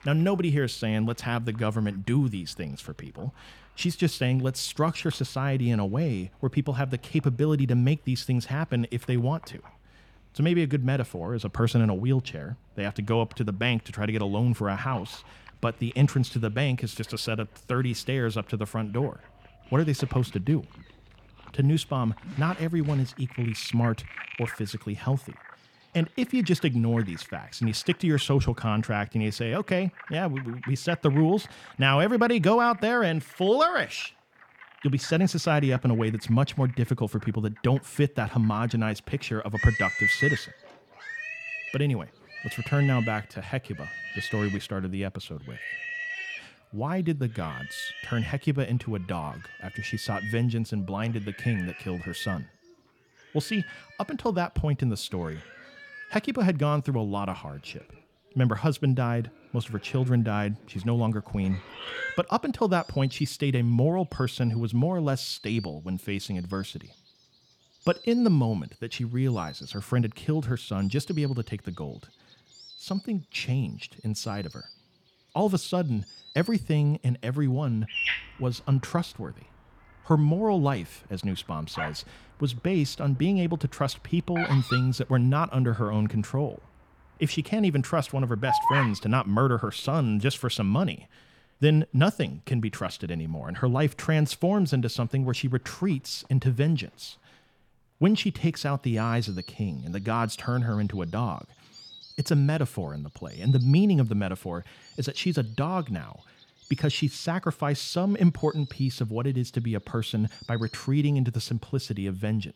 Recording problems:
animal sounds; loud; throughout; 9 dB below the speech

